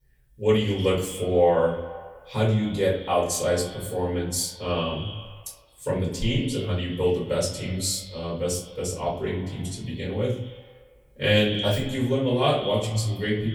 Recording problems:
off-mic speech; far
echo of what is said; noticeable; throughout; 110 ms later, 15 dB below the speech
room echo; slight; dies away in 0.5 s

